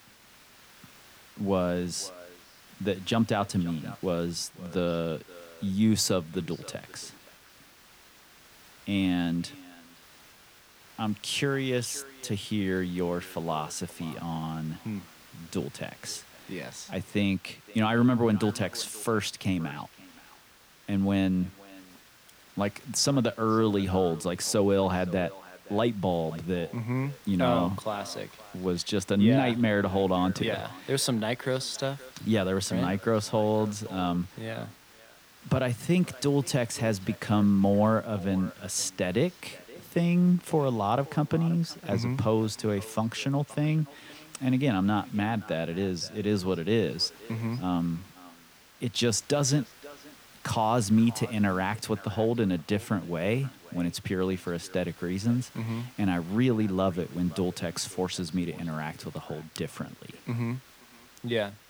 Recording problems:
echo of what is said; faint; throughout; 520 ms later, 20 dB below the speech
hiss; faint; throughout; 25 dB below the speech

